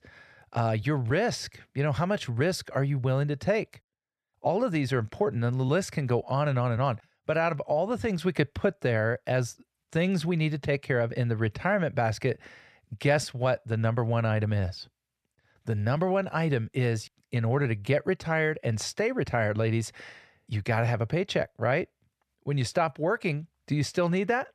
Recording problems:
none

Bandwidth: 13.5 kHz